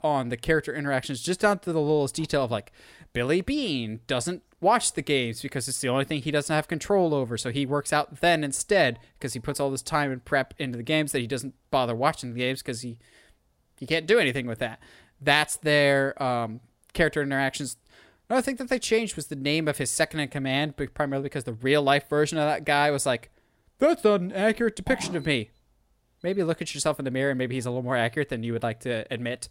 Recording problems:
none

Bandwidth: 16 kHz